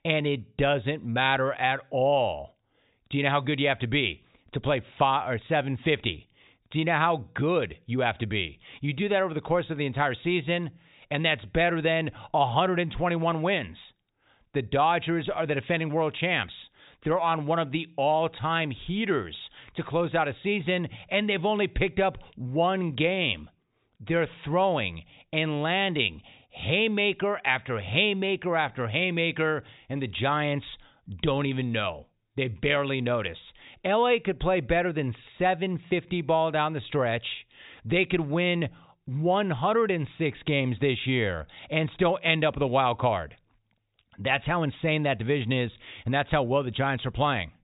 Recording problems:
high frequencies cut off; severe; nothing above 4 kHz

